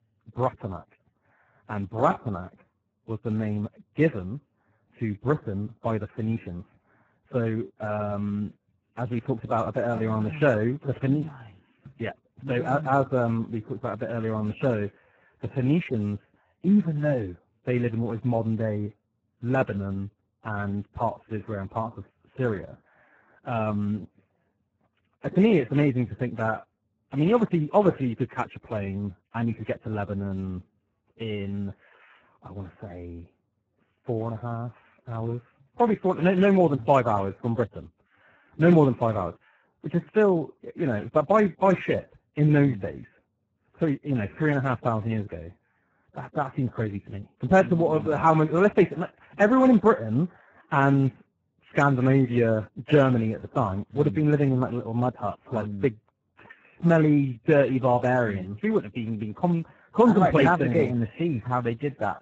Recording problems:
garbled, watery; badly

